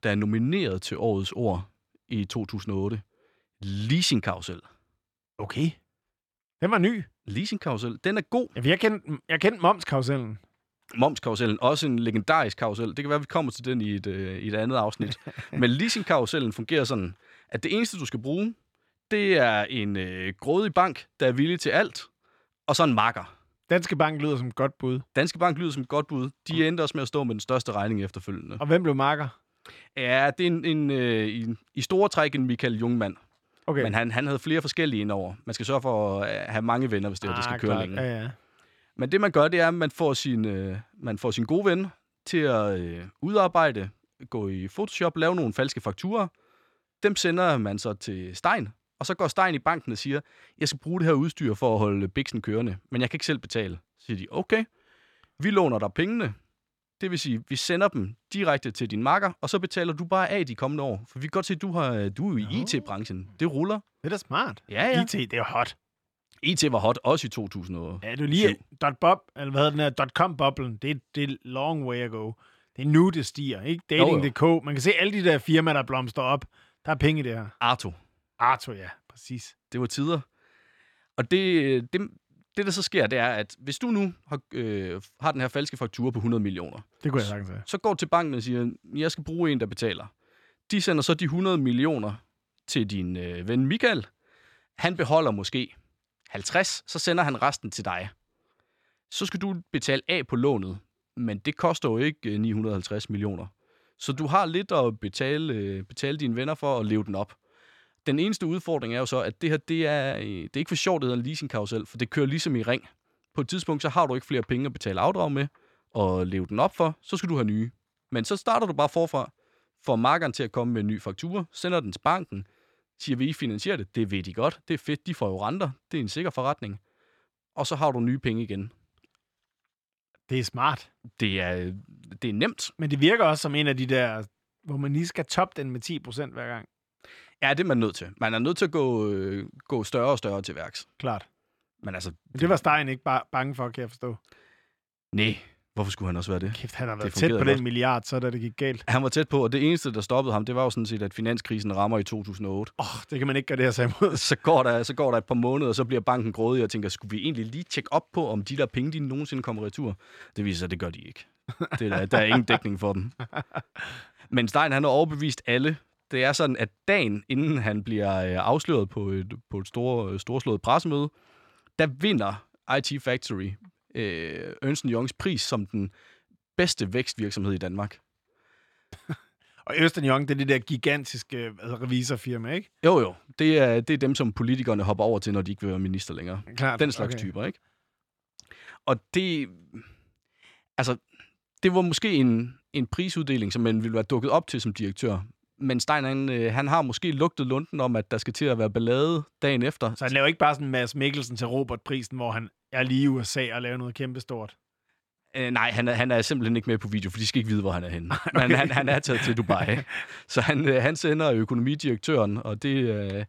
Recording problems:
none

